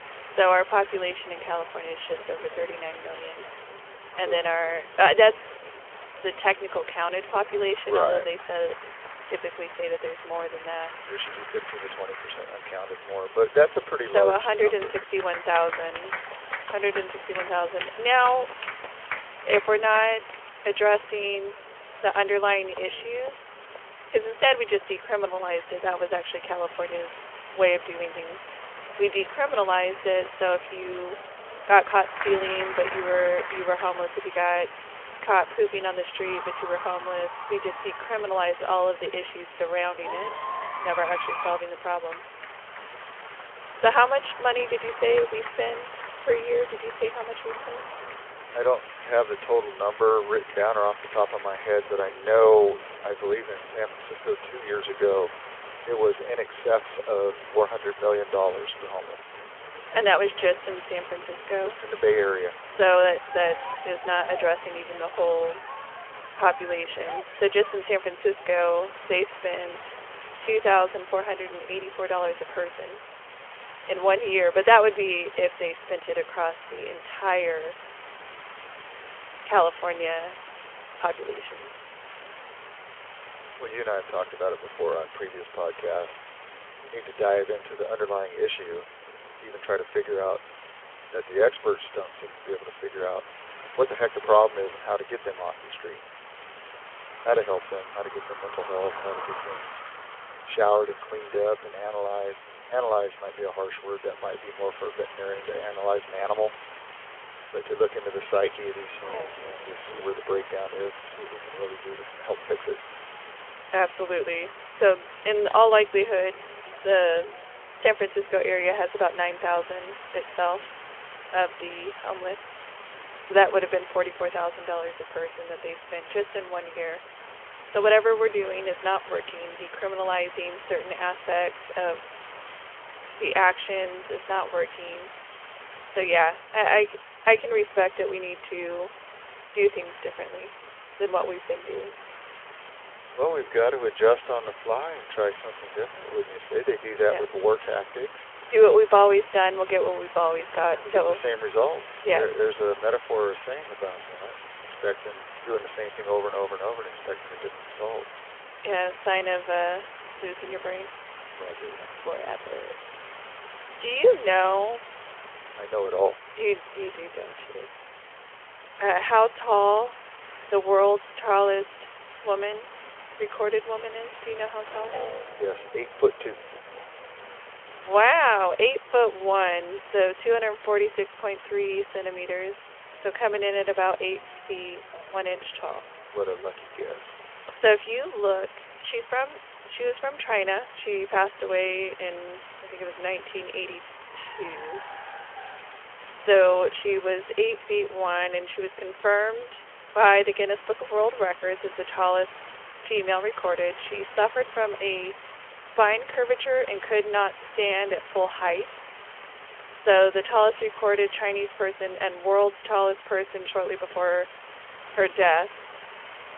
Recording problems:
phone-call audio; nothing above 3 kHz
crowd noise; noticeable; until 1:13; 15 dB below the speech
hiss; noticeable; throughout; 15 dB below the speech
traffic noise; faint; throughout; 25 dB below the speech

